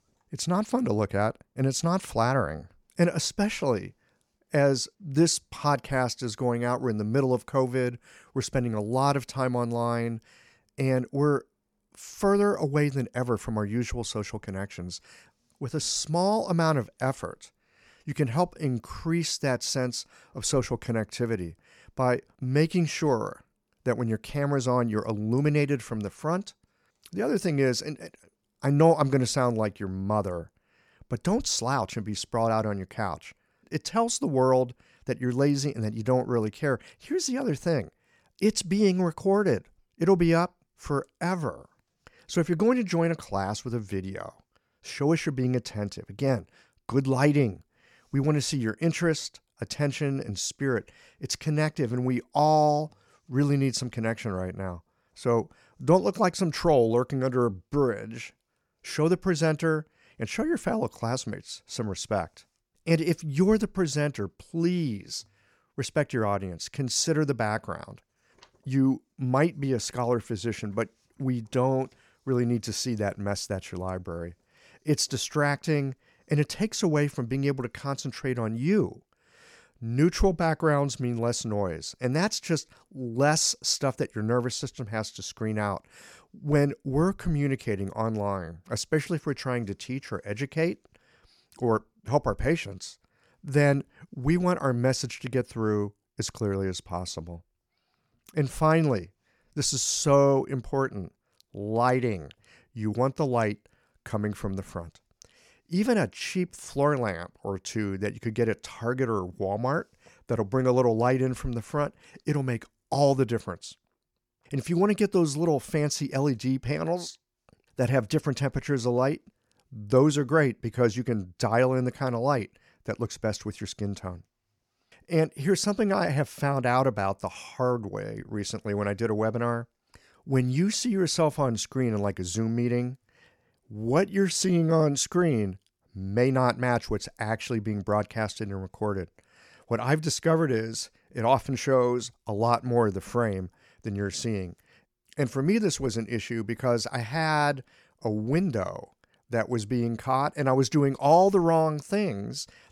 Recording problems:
none

